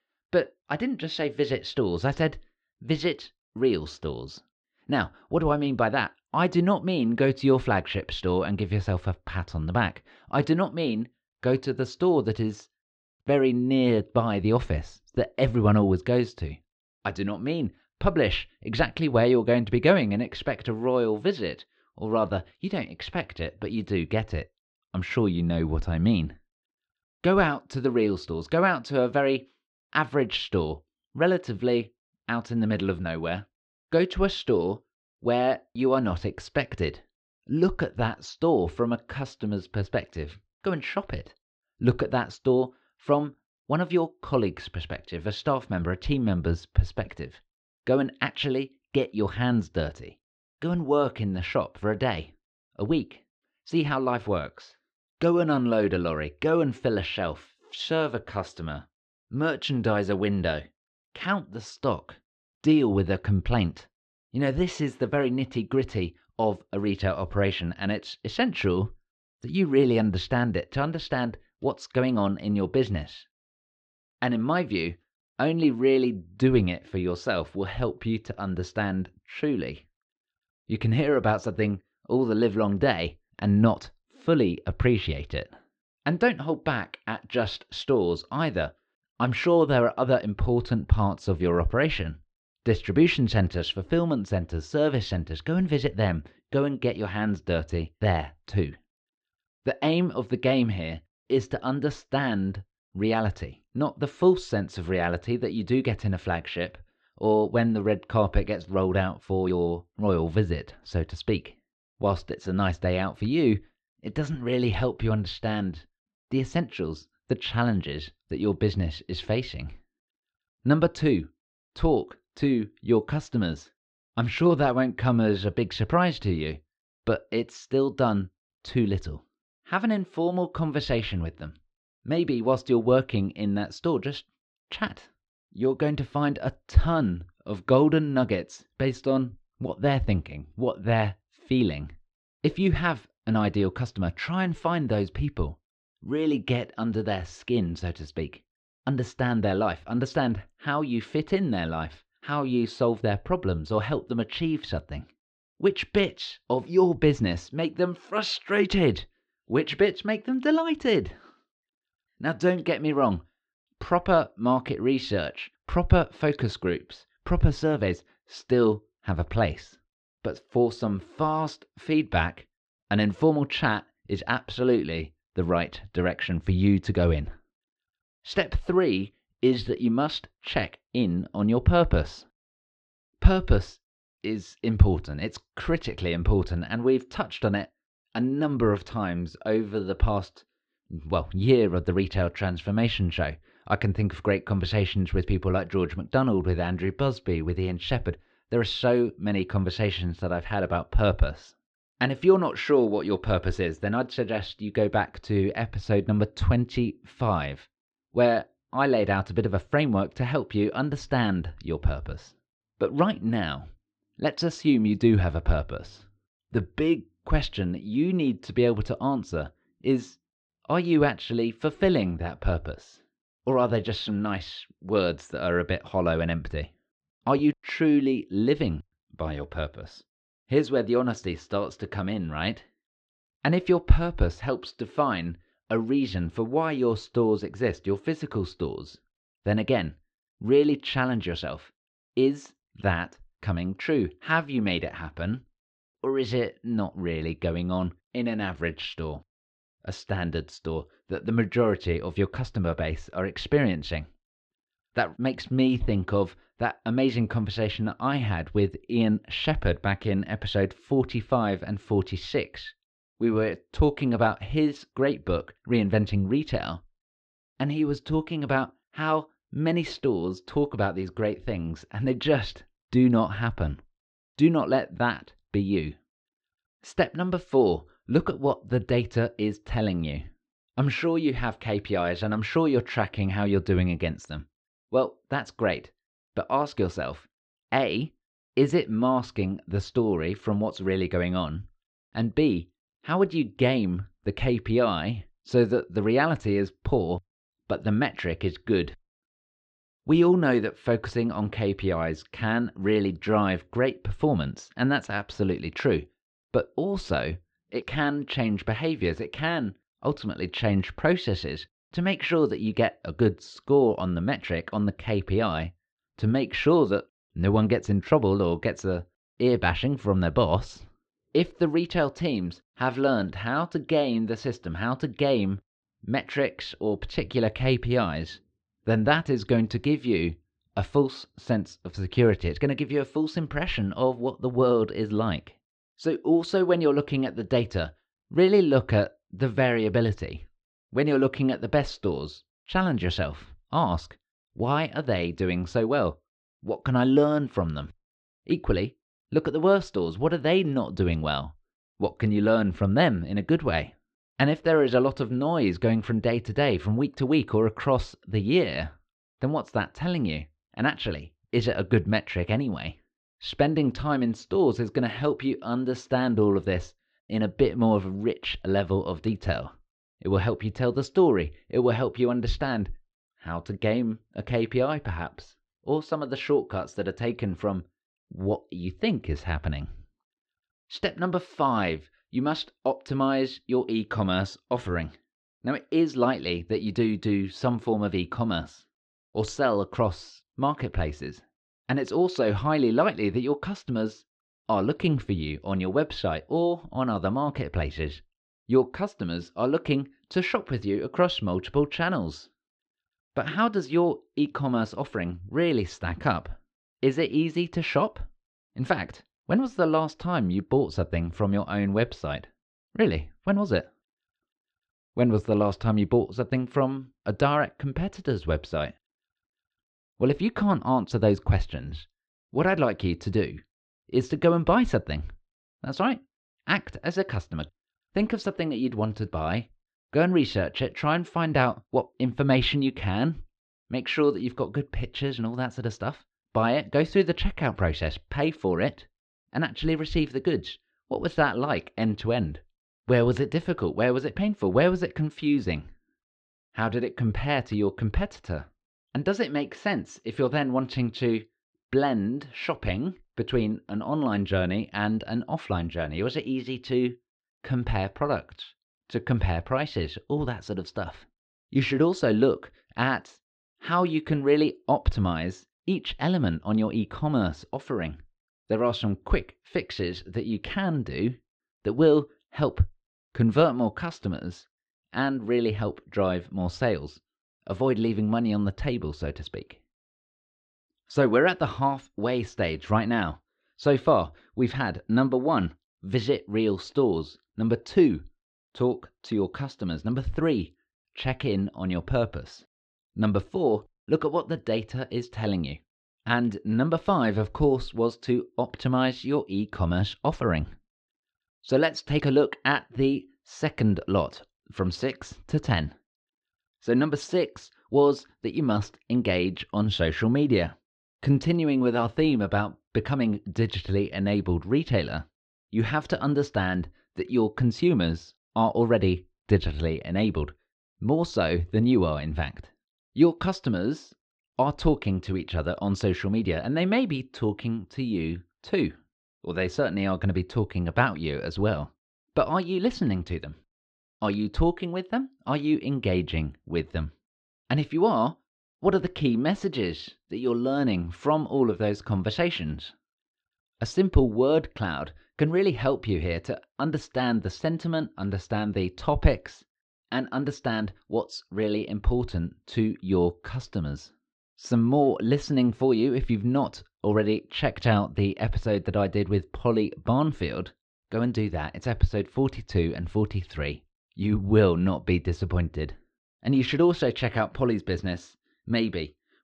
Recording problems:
muffled; slightly; fading above 4 kHz

